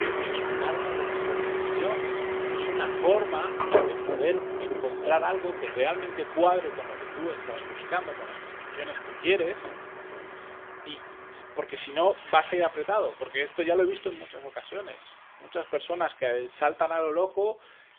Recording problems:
phone-call audio; poor line; nothing above 3.5 kHz
traffic noise; loud; throughout; 3 dB below the speech

